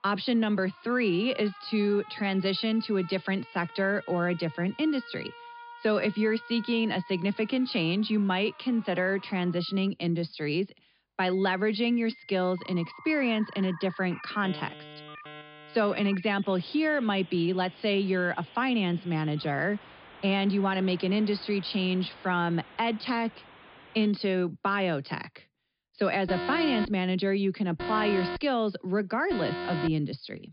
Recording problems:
high frequencies cut off; noticeable; nothing above 5 kHz
alarms or sirens; noticeable; throughout; 15 dB below the speech

